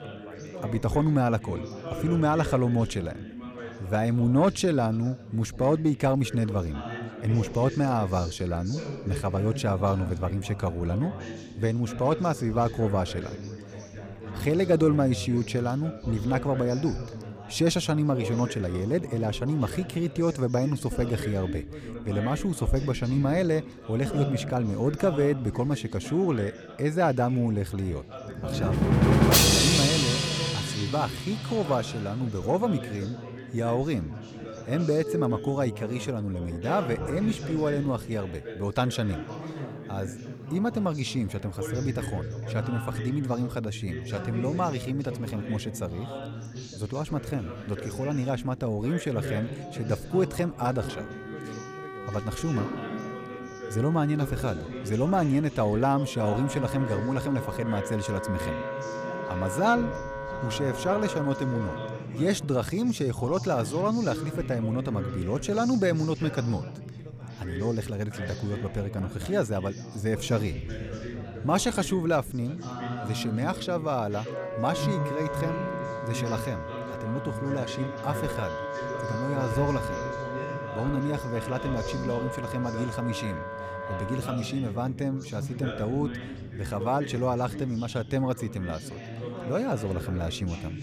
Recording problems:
background music; loud; from 29 s on; 4 dB below the speech
background chatter; loud; throughout; 4 voices, 10 dB below the speech

